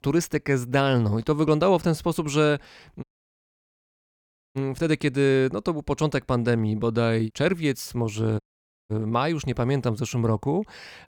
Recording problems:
audio cutting out; at 3 s for 1.5 s and at 8.5 s

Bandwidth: 17.5 kHz